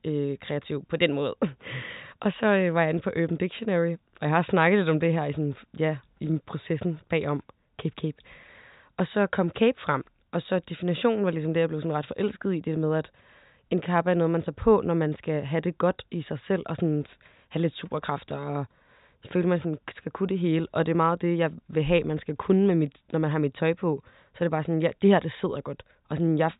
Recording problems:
high frequencies cut off; severe; nothing above 4 kHz

